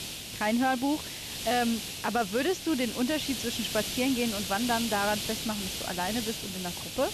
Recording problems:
high frequencies cut off; slight; nothing above 8 kHz
hiss; loud; throughout; 4 dB below the speech

